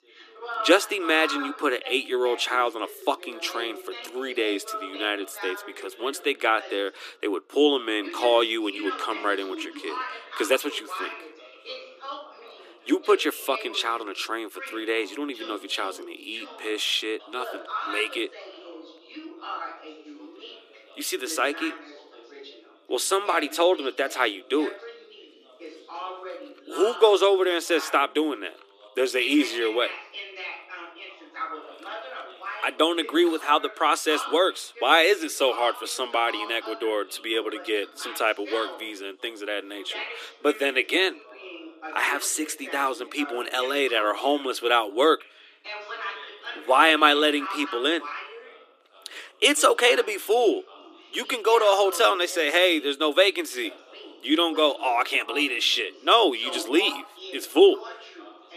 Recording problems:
thin; somewhat; fading below 300 Hz
background chatter; noticeable; throughout; 2 voices, 15 dB below the speech

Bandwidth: 14.5 kHz